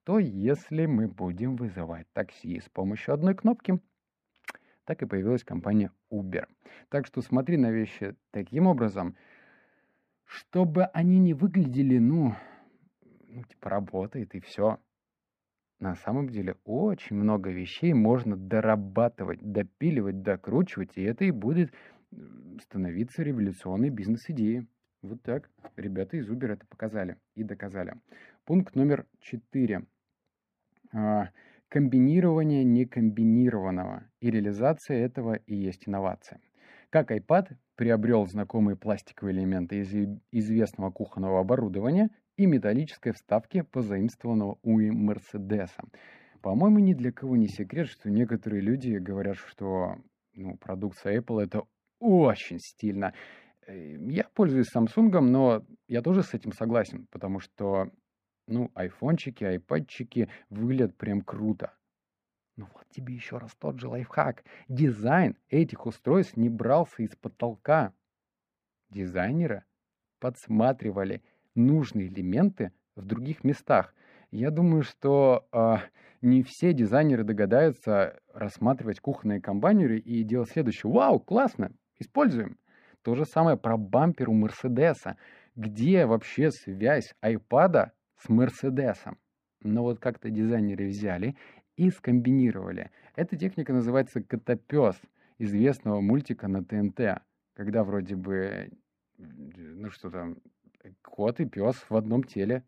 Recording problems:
muffled; very; fading above 3 kHz

